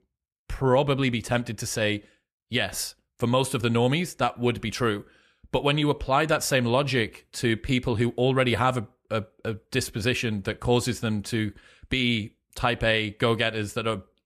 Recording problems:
none

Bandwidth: 14 kHz